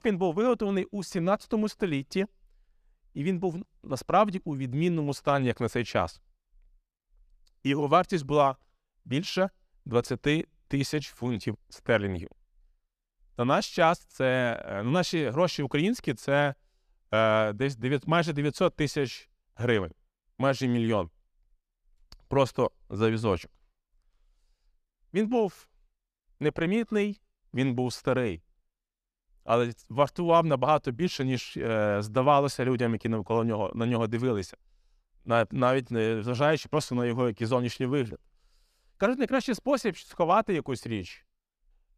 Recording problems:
none

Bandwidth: 14.5 kHz